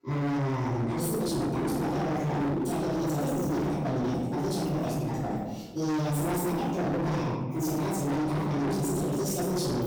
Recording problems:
distortion; heavy; 39% of the sound clipped
room echo; strong; dies away in 1.1 s
off-mic speech; far
wrong speed and pitch; too fast and too high; 1.6 times normal speed

